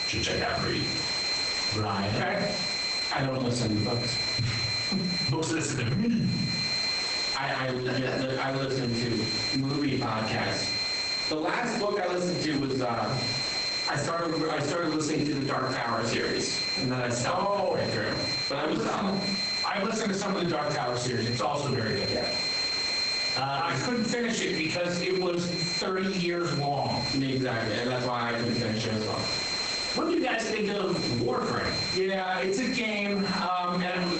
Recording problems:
off-mic speech; far
garbled, watery; badly; nothing above 8 kHz
squashed, flat; heavily
room echo; noticeable; dies away in 0.5 s
high-pitched whine; loud; throughout; 4 kHz, 3 dB below the speech
hiss; noticeable; throughout; 10 dB below the speech

